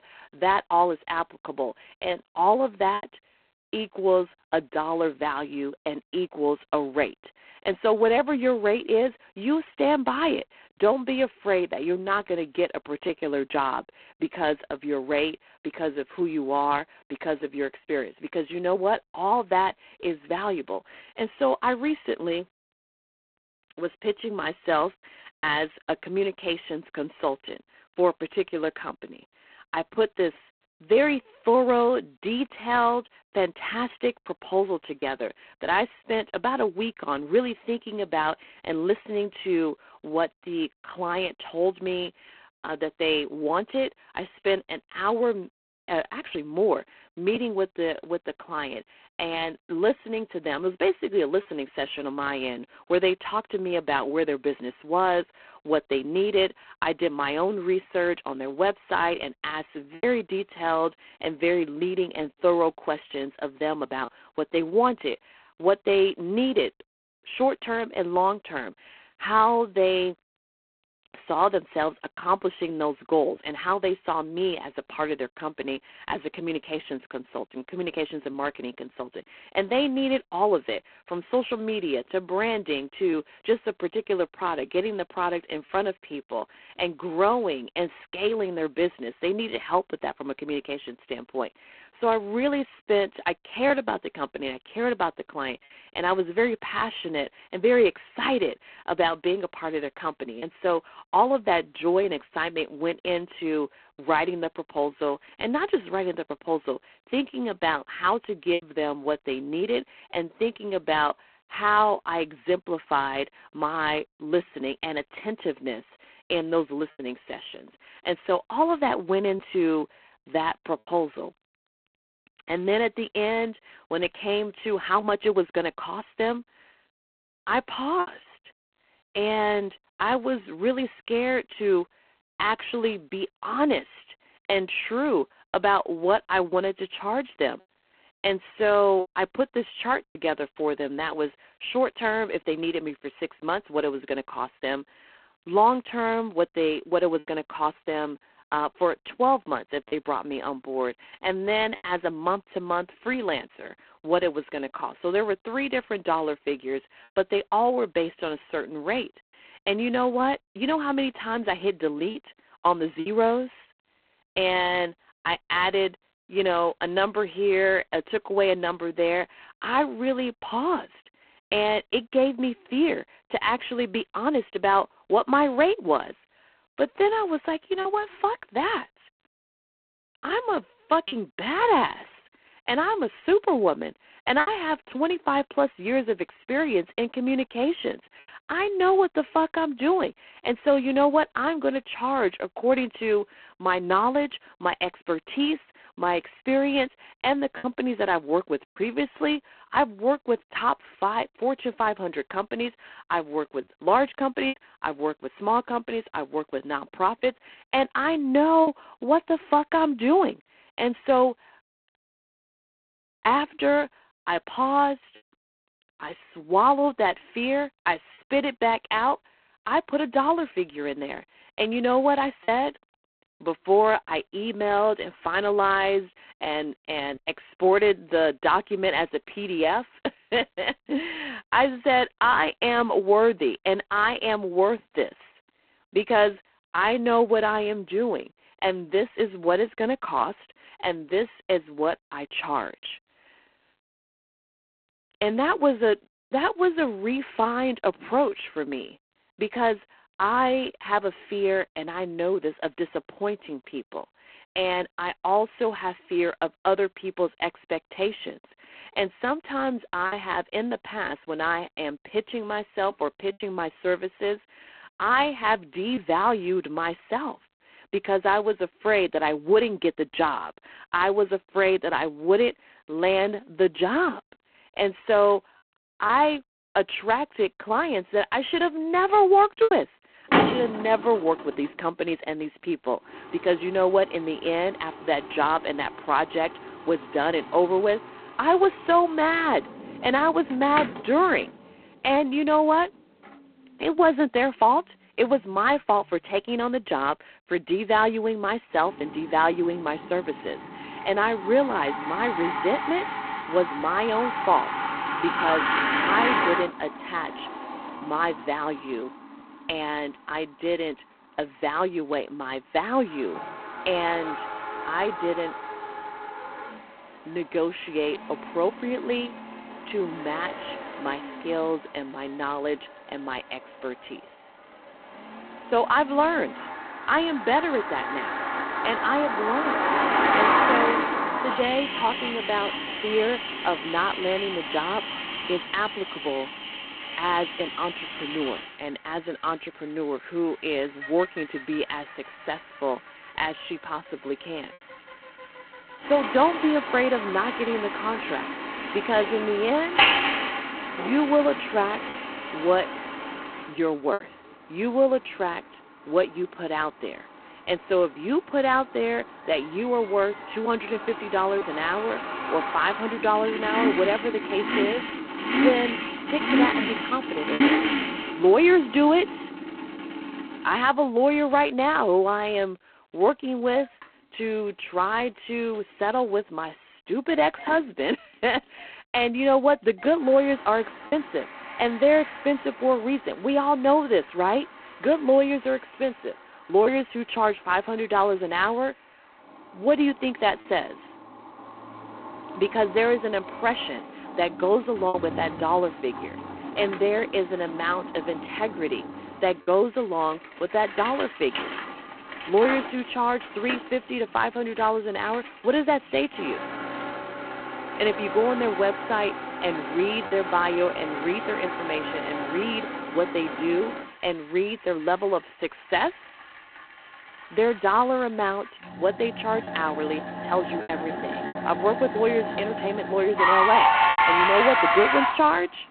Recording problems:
phone-call audio; poor line
traffic noise; loud; from 4:40 on; 3 dB below the speech
choppy; occasionally; 1% of the speech affected

